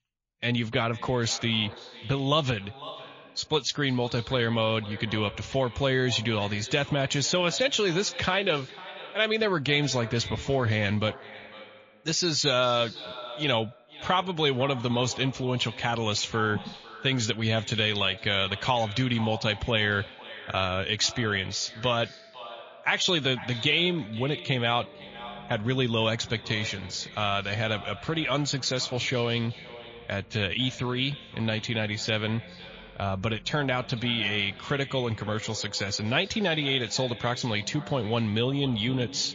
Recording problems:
echo of what is said; noticeable; throughout; 500 ms later, 15 dB below the speech
garbled, watery; slightly
background music; faint; from 21 s on; 25 dB below the speech

